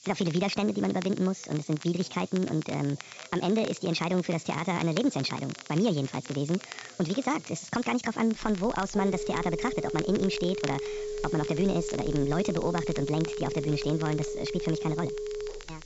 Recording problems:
wrong speed and pitch; too fast and too high; 1.6 times normal speed
high frequencies cut off; noticeable; nothing above 8 kHz
crackle, like an old record; noticeable; 15 dB below the speech
background chatter; faint; throughout; 3 voices, 25 dB below the speech
hiss; faint; throughout; 20 dB below the speech
phone ringing; noticeable; from 8.5 s on; peak 5 dB below the speech

